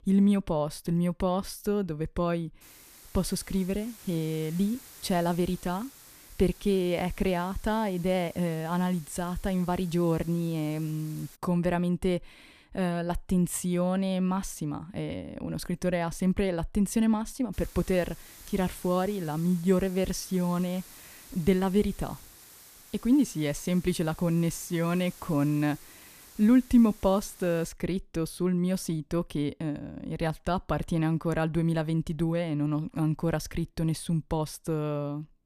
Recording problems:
hiss; faint; from 2.5 to 11 s and from 18 to 28 s; 20 dB below the speech

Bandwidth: 14.5 kHz